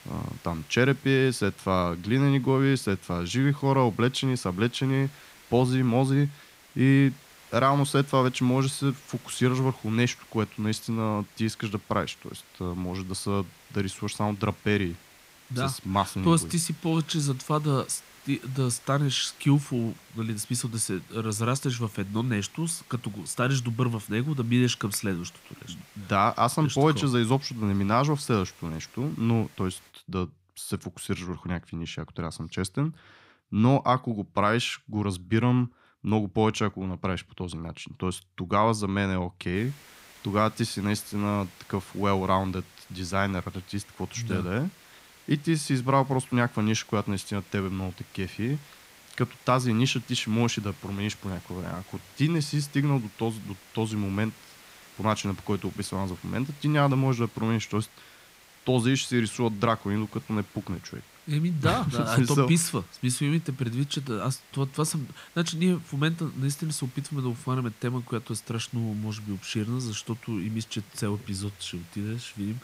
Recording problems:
hiss; faint; until 30 s and from 40 s on; 25 dB below the speech

